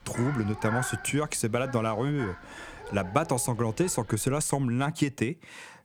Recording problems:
animal sounds; noticeable; until 4.5 s; 10 dB below the speech

